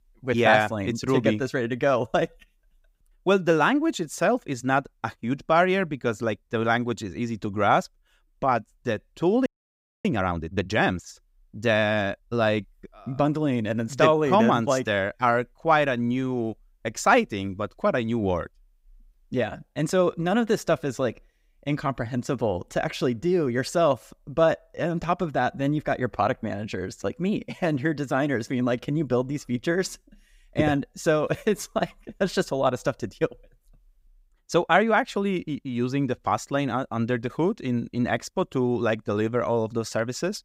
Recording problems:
audio freezing; at 9.5 s for 0.5 s

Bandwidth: 15.5 kHz